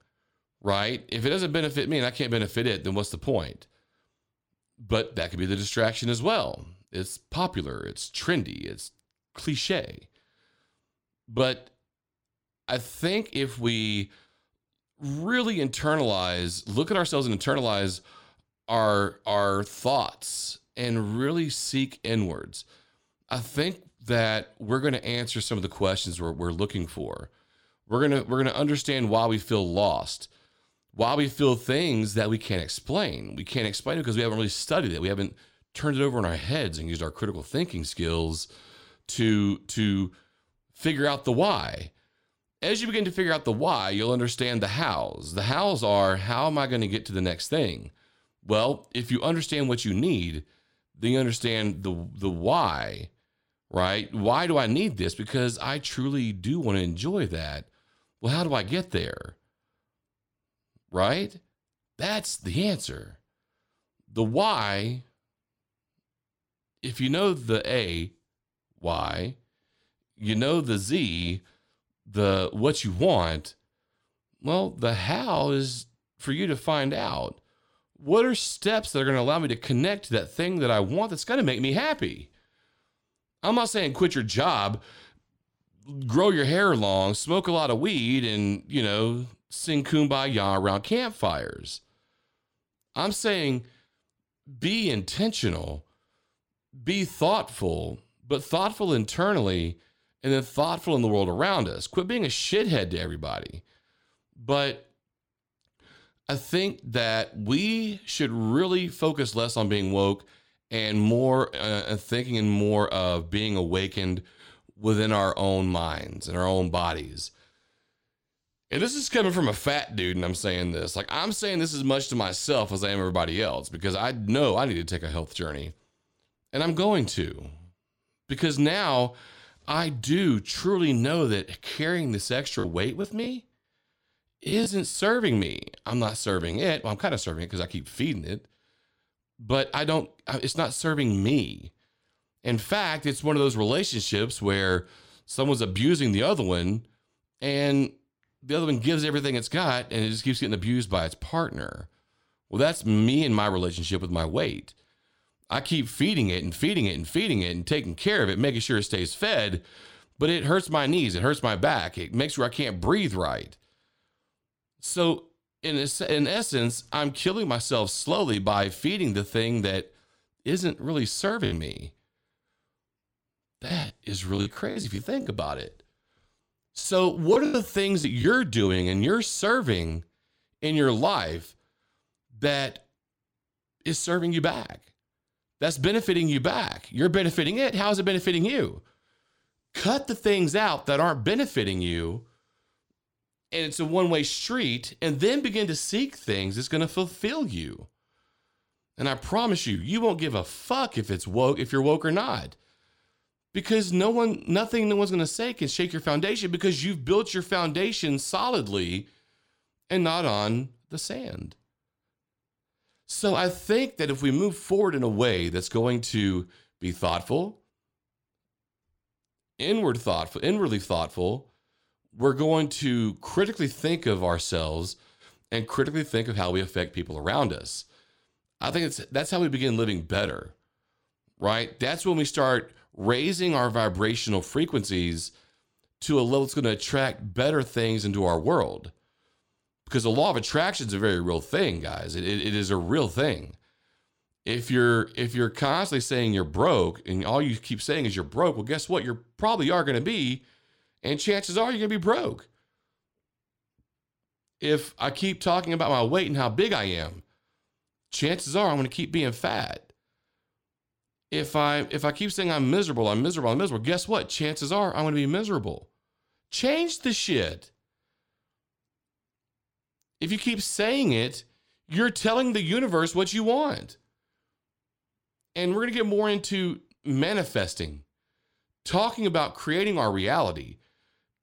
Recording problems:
choppy; very; from 2:13 to 2:15, from 2:51 to 2:55 and from 2:57 to 2:58; 12% of the speech affected

